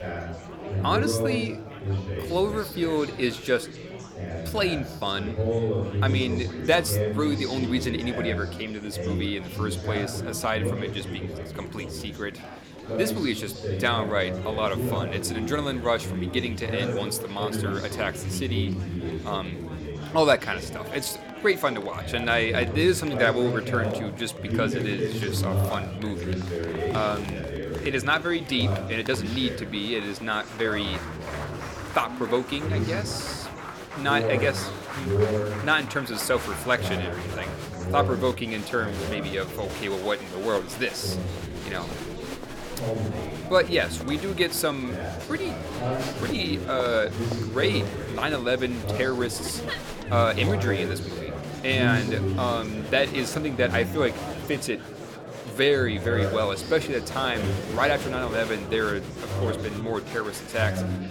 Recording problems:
chatter from many people; loud; throughout; 4 dB below the speech

